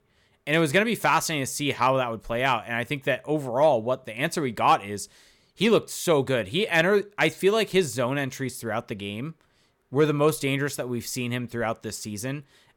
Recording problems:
none

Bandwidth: 17.5 kHz